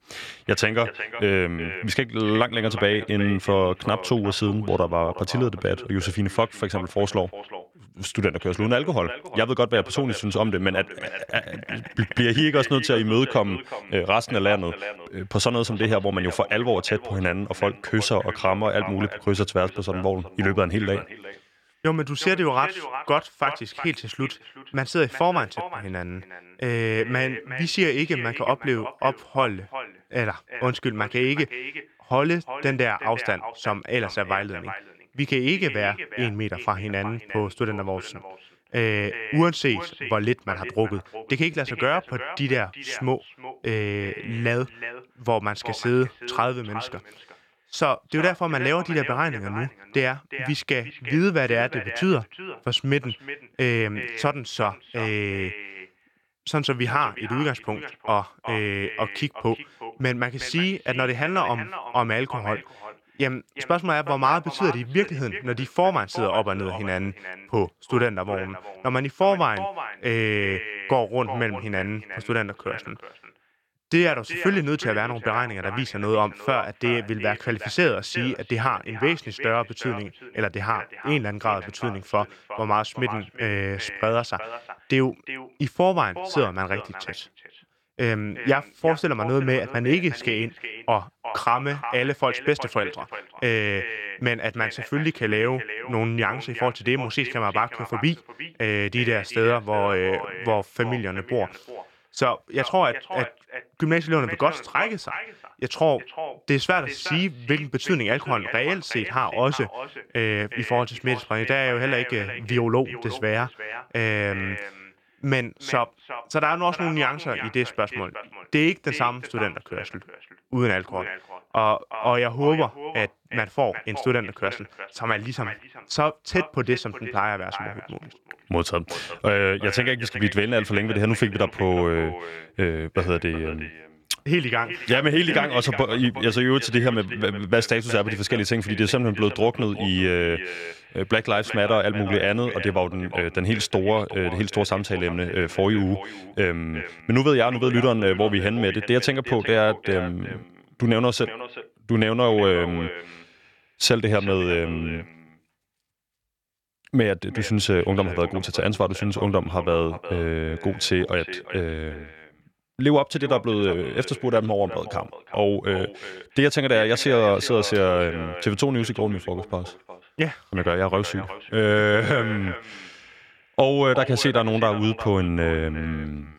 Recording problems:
echo of what is said; strong; throughout; 360 ms later, 10 dB below the speech

